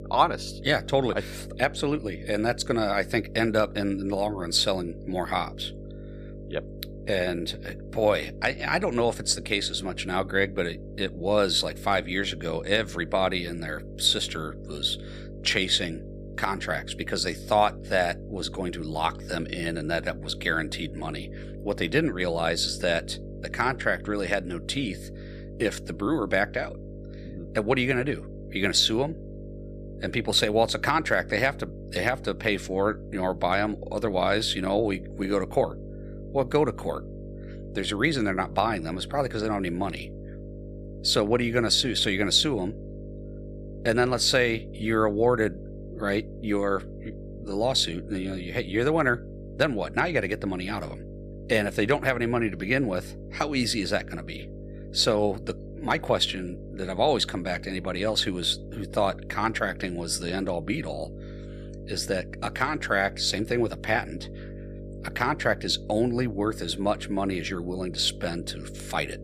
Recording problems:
electrical hum; noticeable; throughout; 50 Hz, 20 dB below the speech

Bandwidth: 14.5 kHz